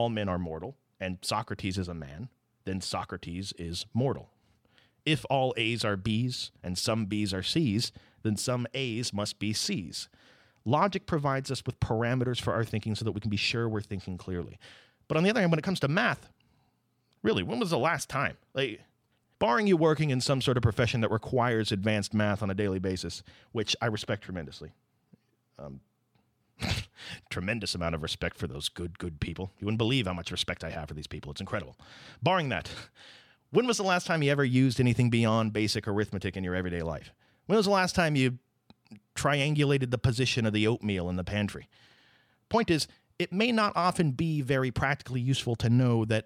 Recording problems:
abrupt cut into speech; at the start

